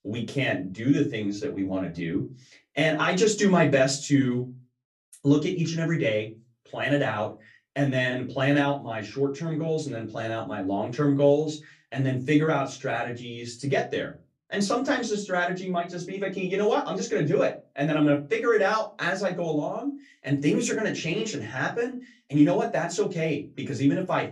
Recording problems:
off-mic speech; far
room echo; very slight; dies away in 0.2 s

